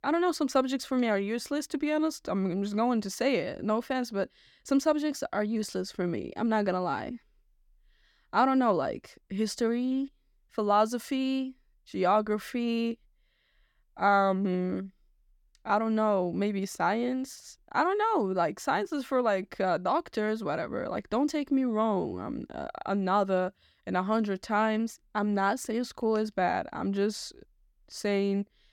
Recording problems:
none

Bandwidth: 17.5 kHz